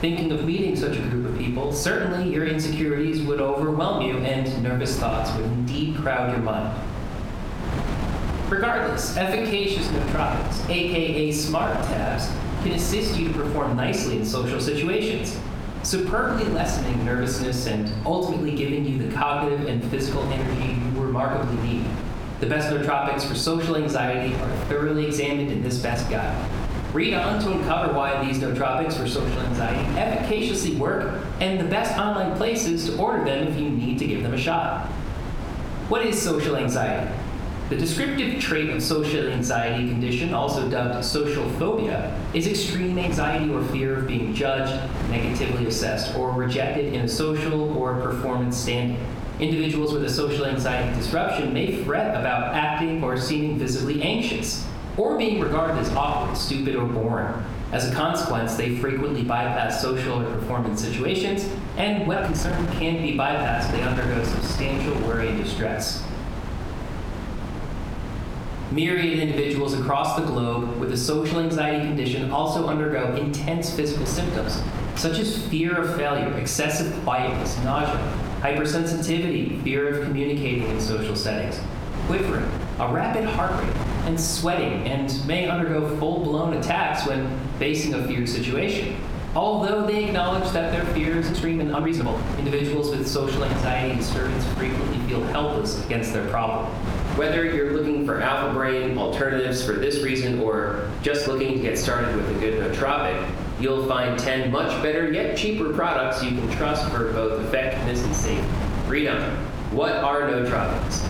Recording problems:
off-mic speech; far
room echo; slight; dies away in 0.6 s
squashed, flat; somewhat
wind noise on the microphone; occasional gusts; 10 dB below the speech
uneven, jittery; strongly; from 2.5 s to 1:41

